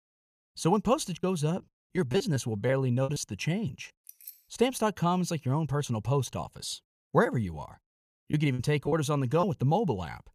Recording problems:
choppy; very; from 1 to 3 s and from 8.5 to 9.5 s; 10% of the speech affected
jangling keys; faint; at 4 s; peak 15 dB below the speech

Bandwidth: 14.5 kHz